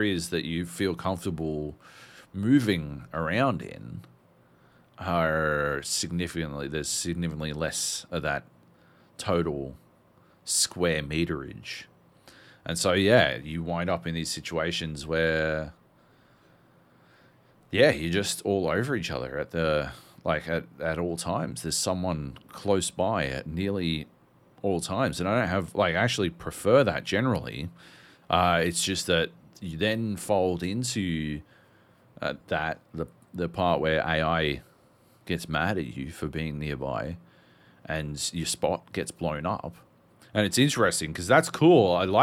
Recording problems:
abrupt cut into speech; at the start and the end

